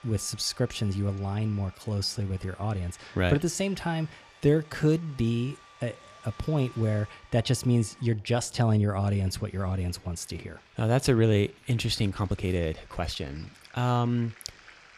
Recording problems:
household noises; faint; throughout; 25 dB below the speech
uneven, jittery; strongly; from 1.5 to 13 s

